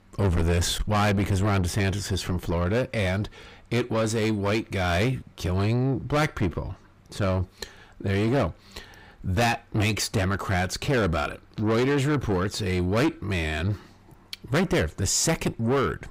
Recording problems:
distortion; heavy; 7 dB below the speech

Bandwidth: 15.5 kHz